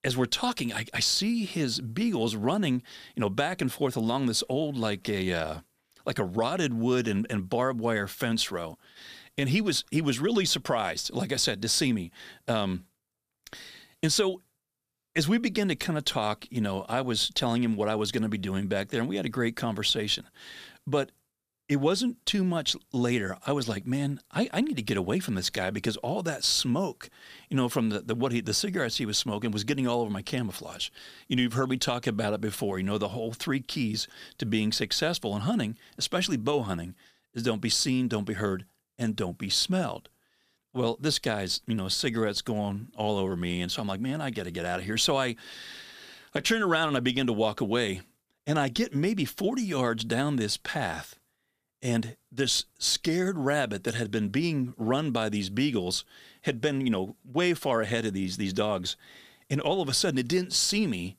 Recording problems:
none

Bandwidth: 15 kHz